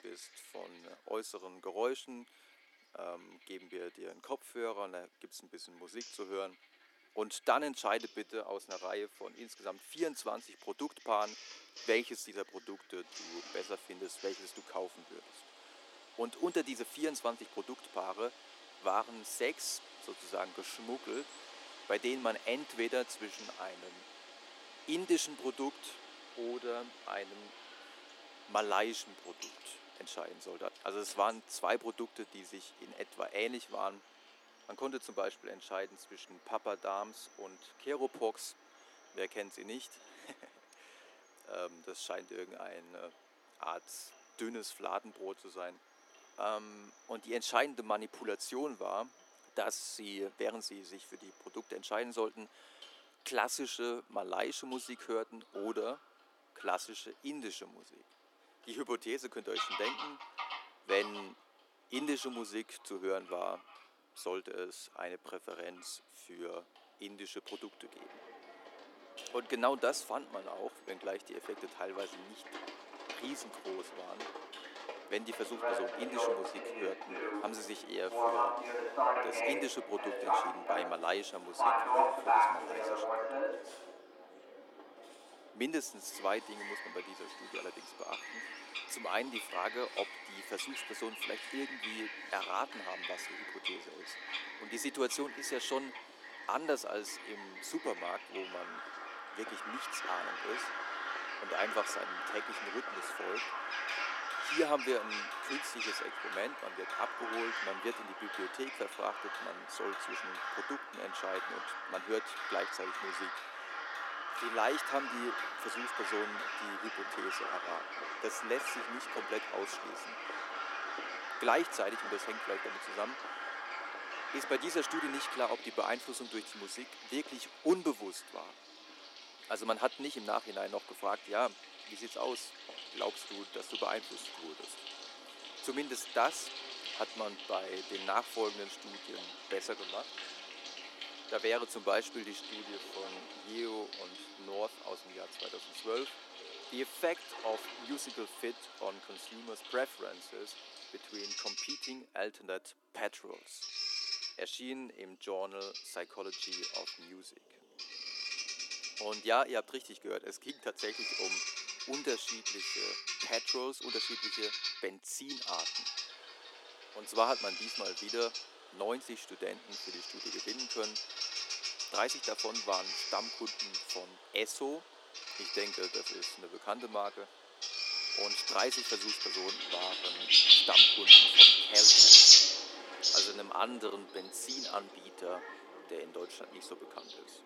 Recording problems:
thin; very; fading below 300 Hz
animal sounds; very loud; throughout; 10 dB above the speech
household noises; noticeable; throughout; 20 dB below the speech

